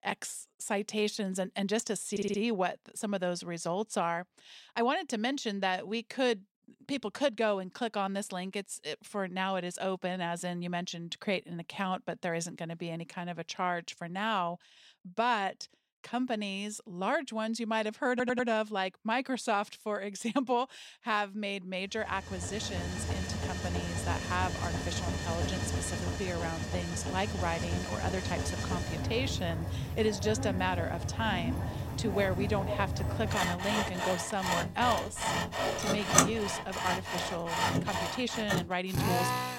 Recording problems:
machinery noise; very loud; from 22 s on; as loud as the speech
audio stuttering; at 2 s and at 18 s

